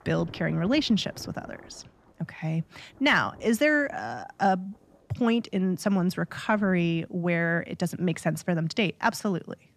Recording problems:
rain or running water; faint; throughout; 25 dB below the speech

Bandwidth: 14 kHz